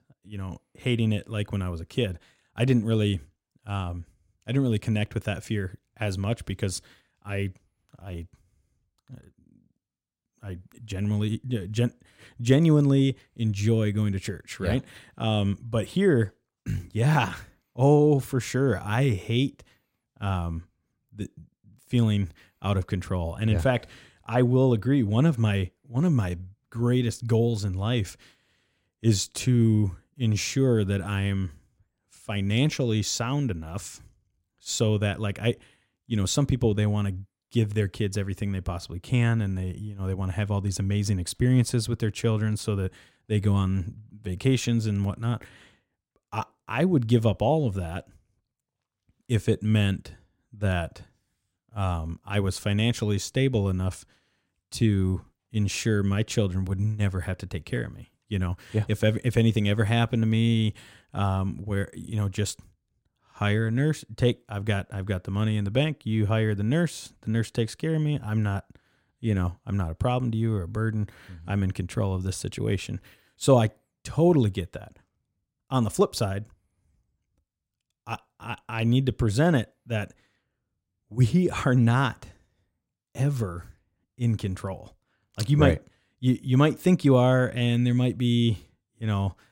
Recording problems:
none

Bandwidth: 16 kHz